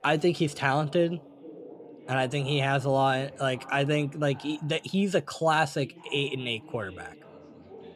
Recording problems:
background chatter; faint; throughout; 2 voices, 20 dB below the speech

